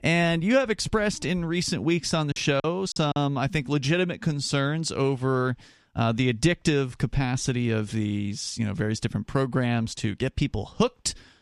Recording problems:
choppy; very; at 2.5 s; 11% of the speech affected

